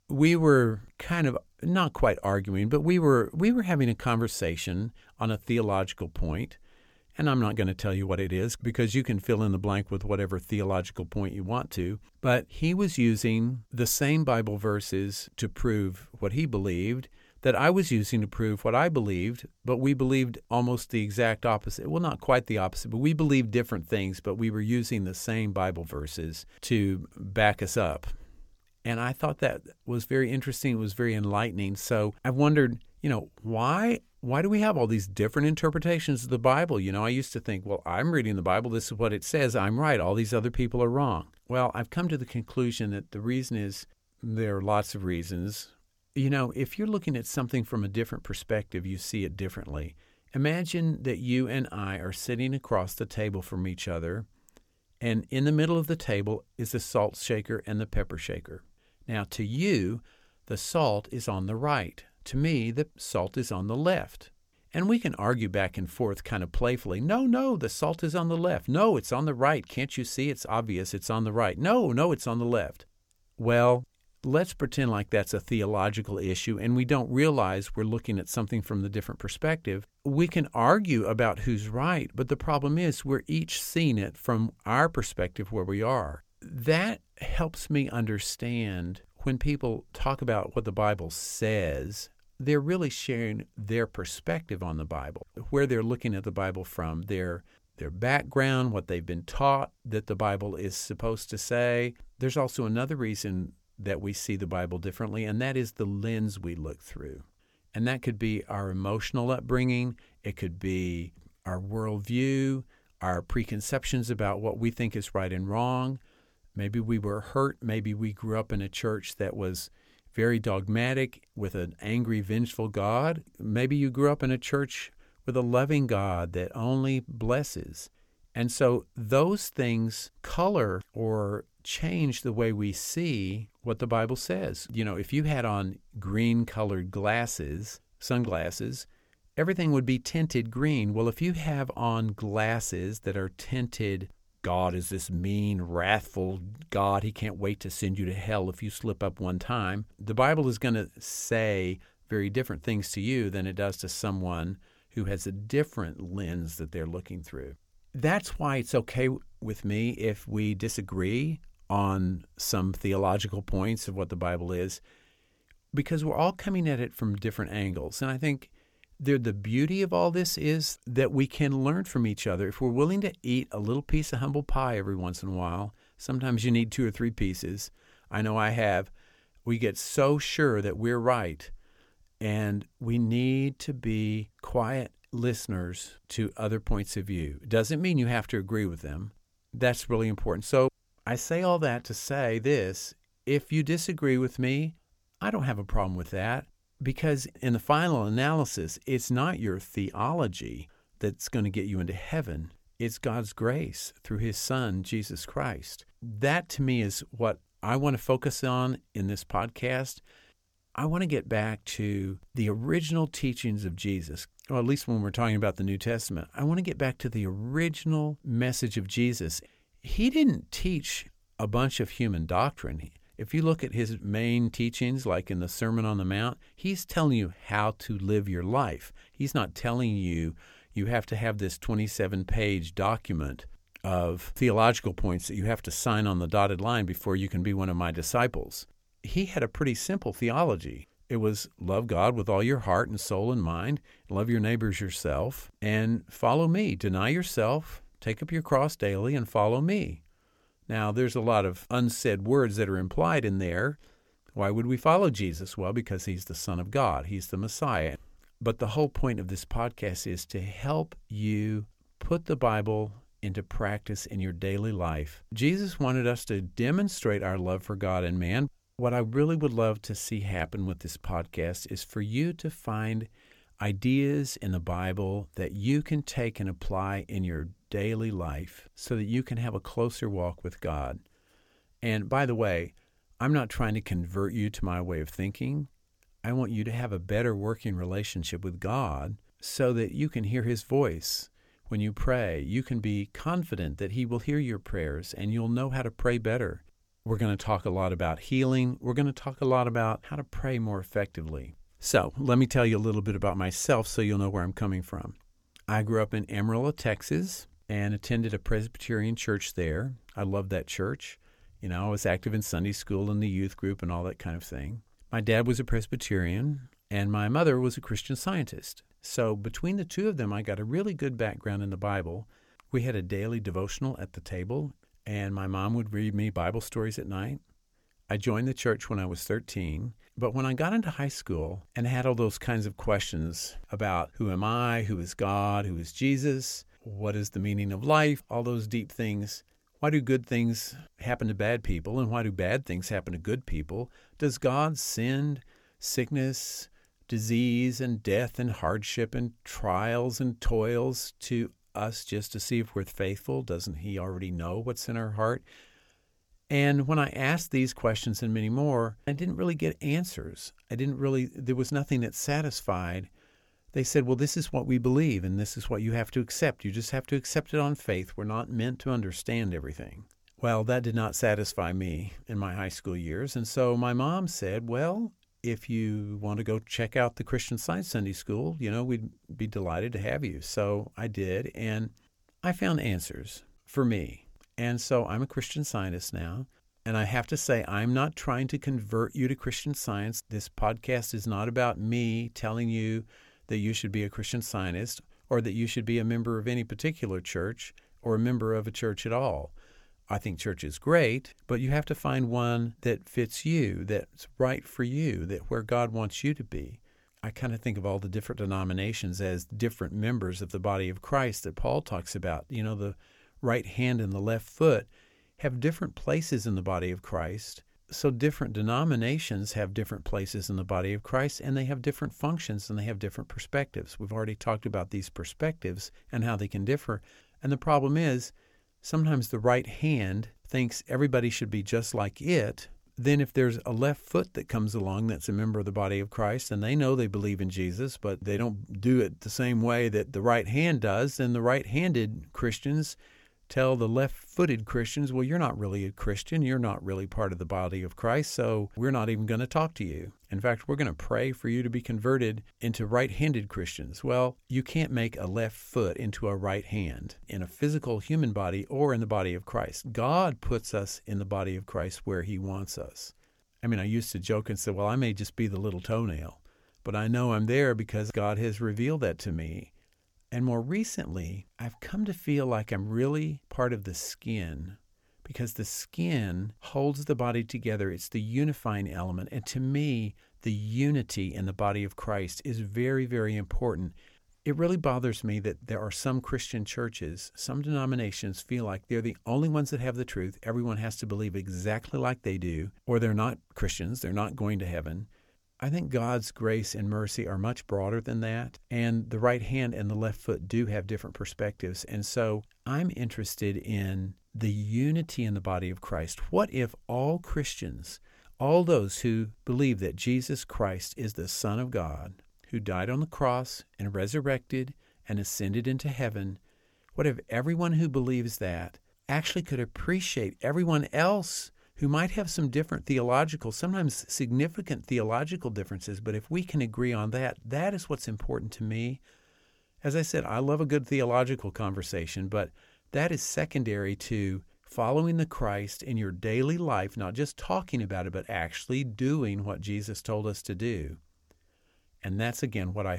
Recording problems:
abrupt cut into speech; at the end

